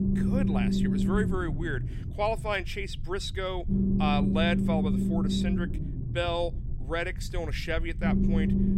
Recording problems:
low rumble; loud; throughout; 3 dB below the speech

